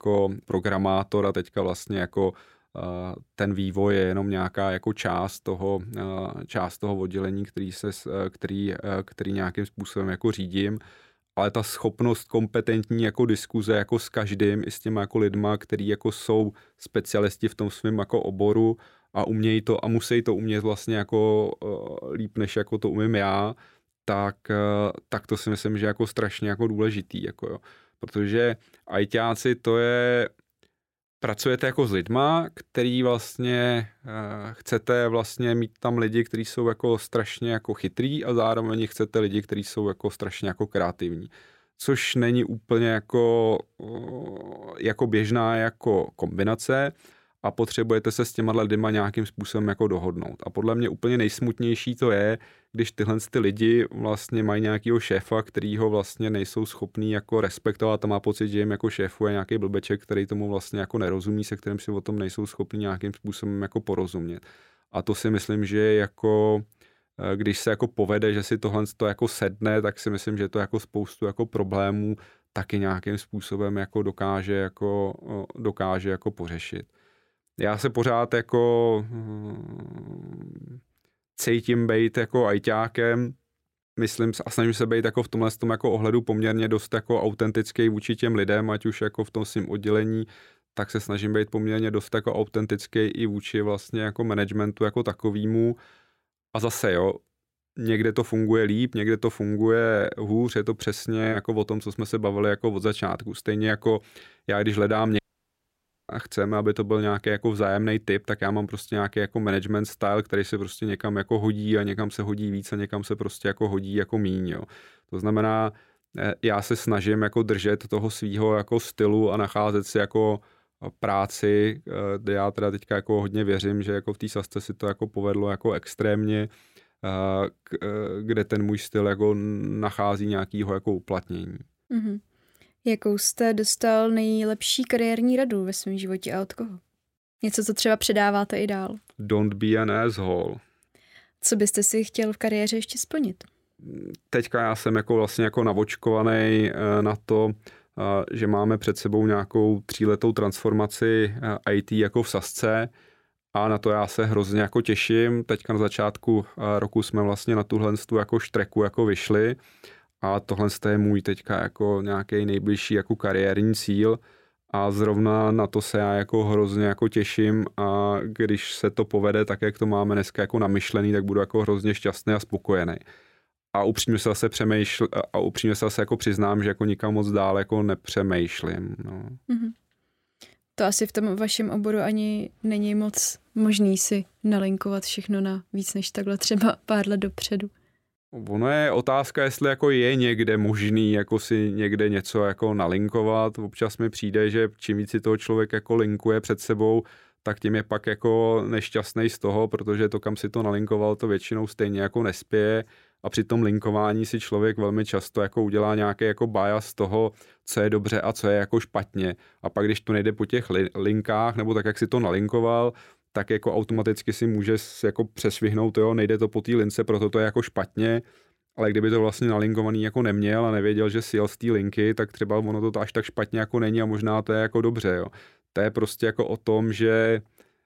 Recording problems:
audio cutting out; at 1:45 for 1 s

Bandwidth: 16 kHz